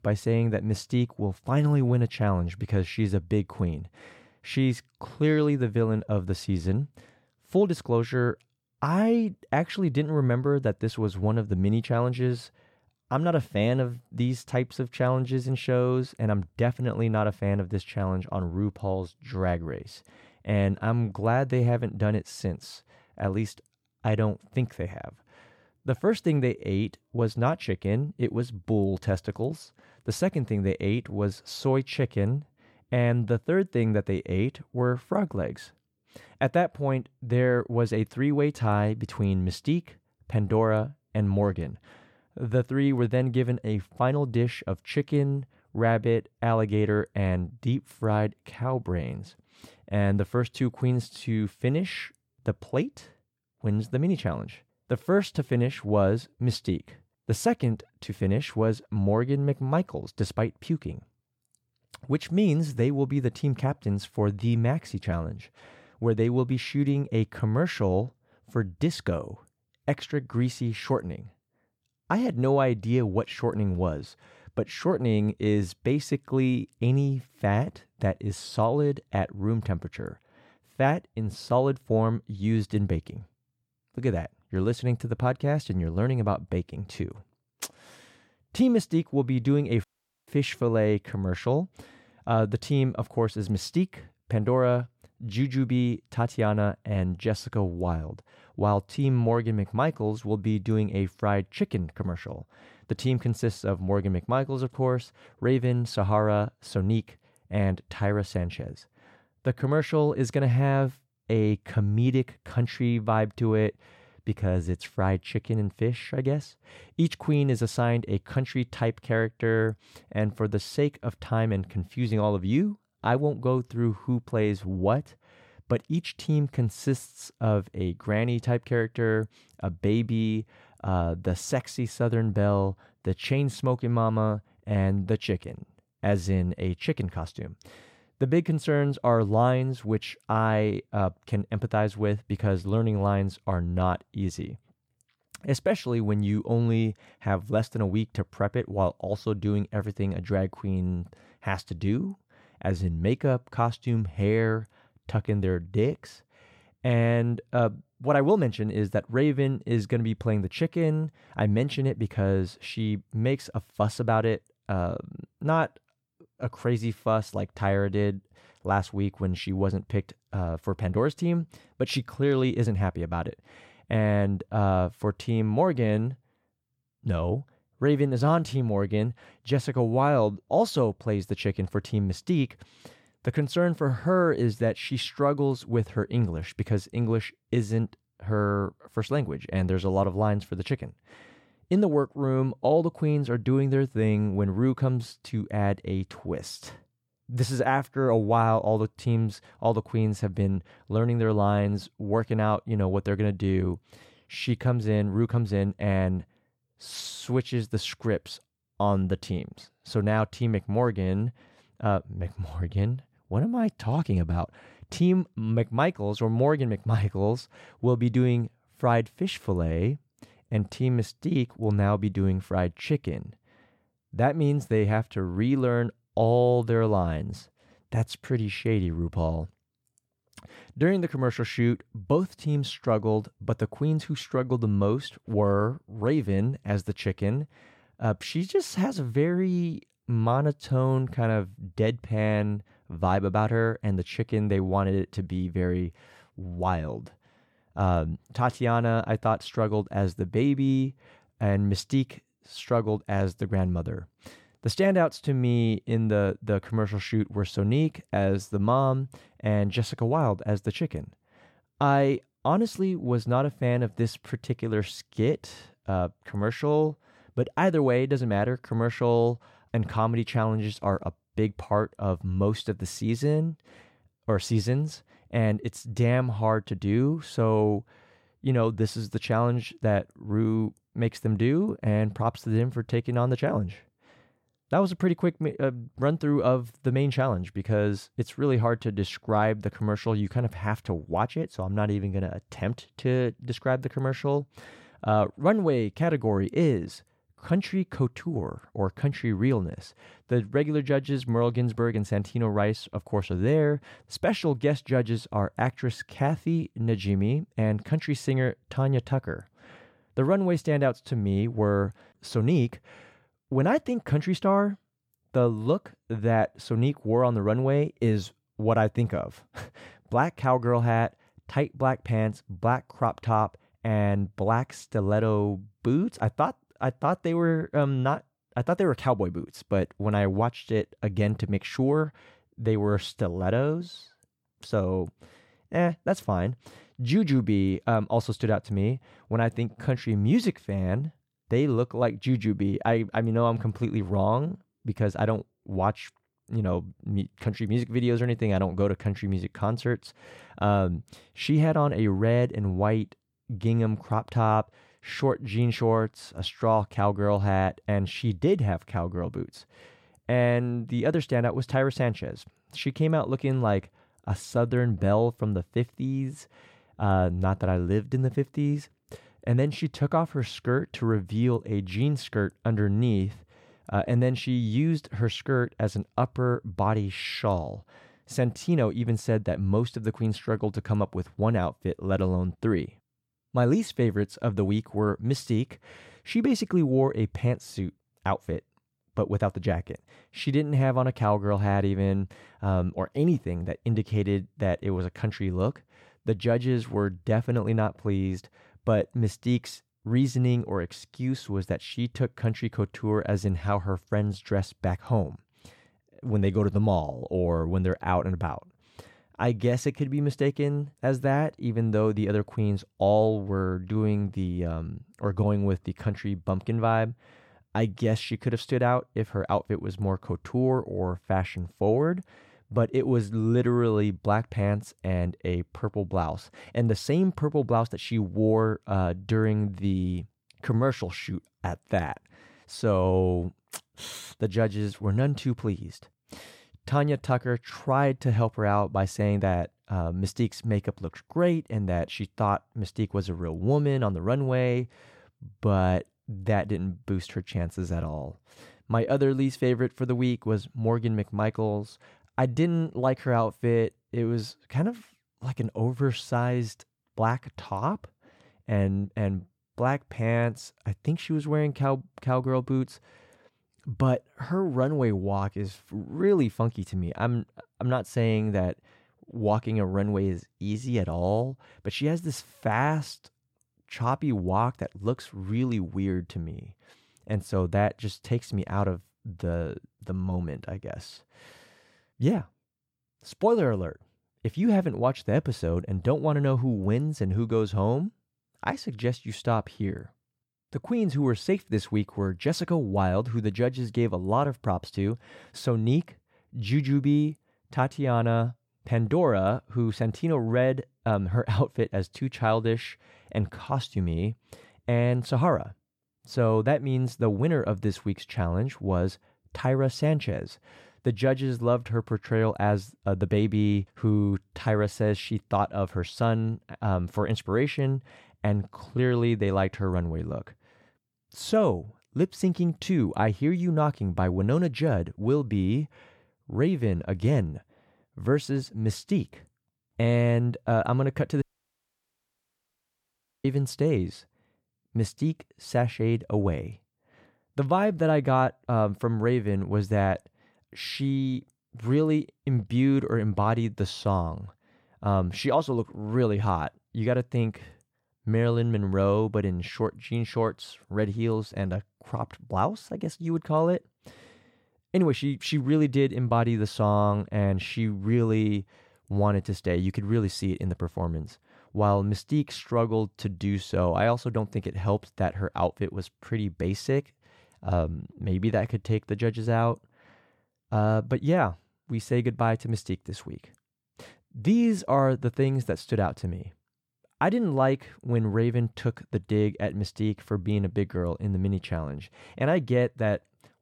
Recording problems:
audio cutting out; at 1:30 and at 8:51 for 2 s

